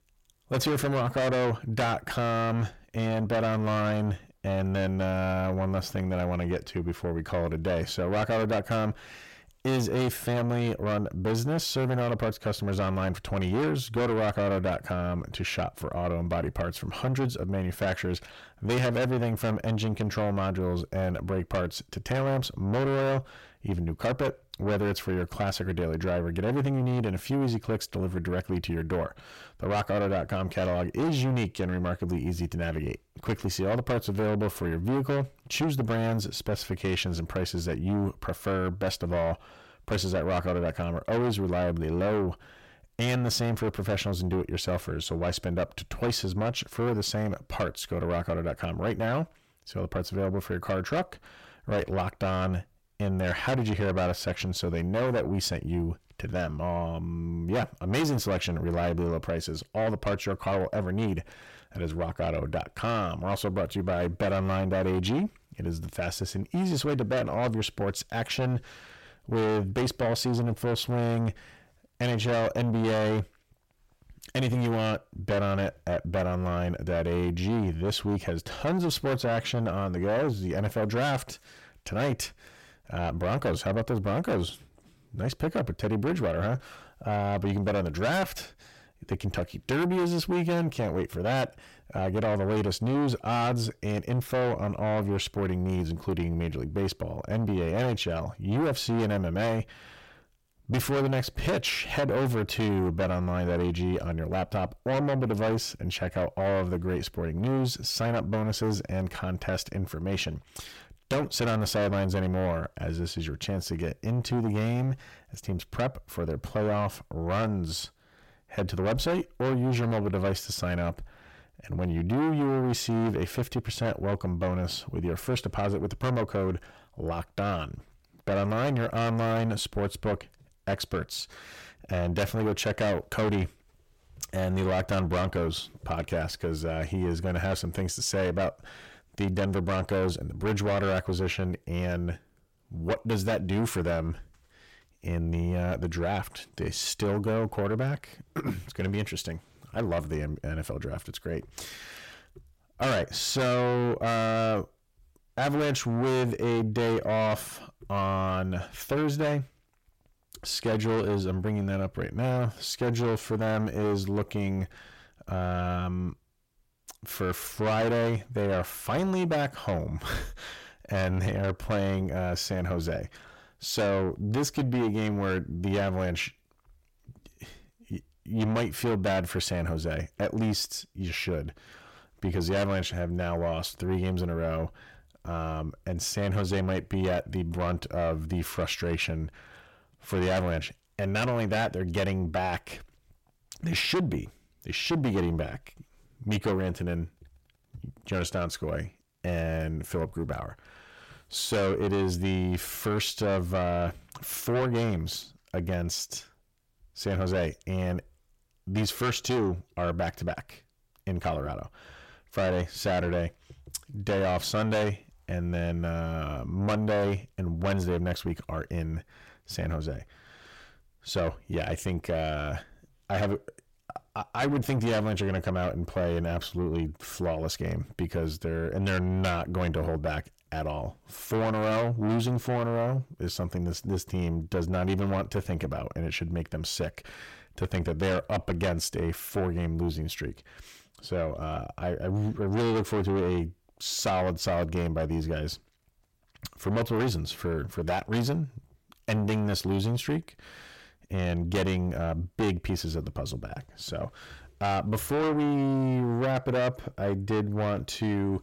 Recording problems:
distortion; heavy; 6 dB below the speech

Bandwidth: 16.5 kHz